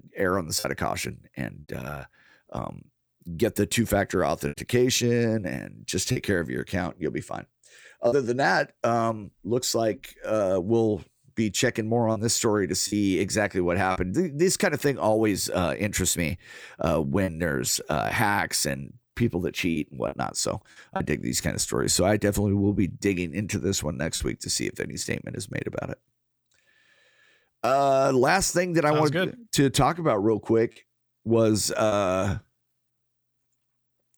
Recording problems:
choppy; occasionally; 2% of the speech affected

